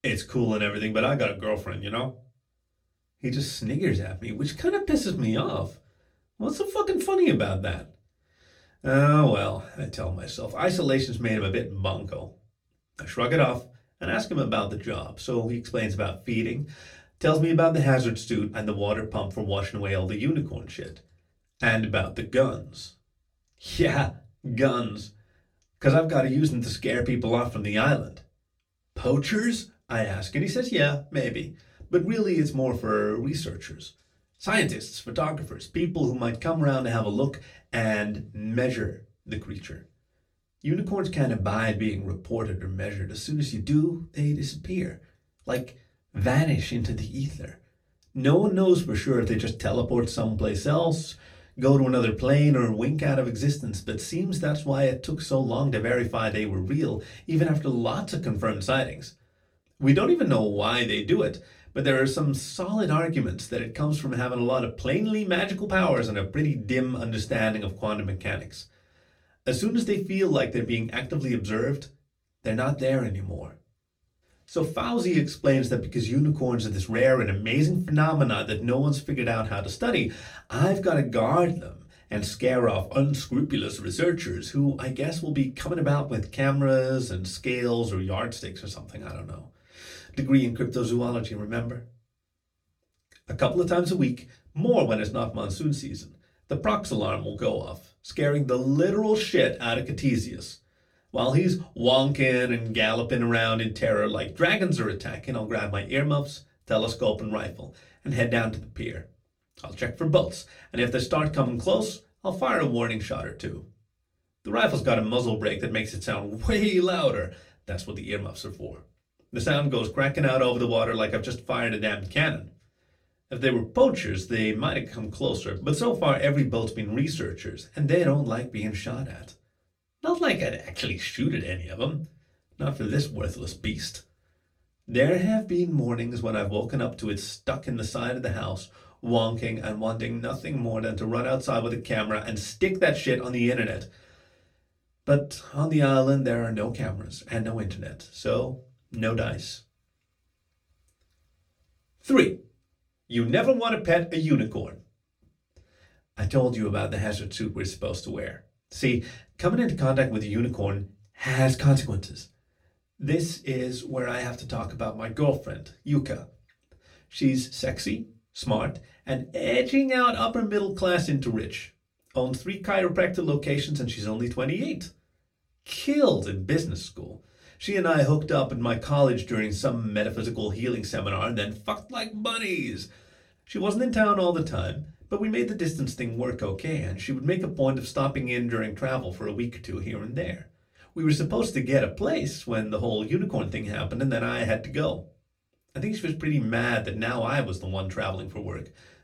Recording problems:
off-mic speech; far
room echo; very slight; dies away in 0.2 s

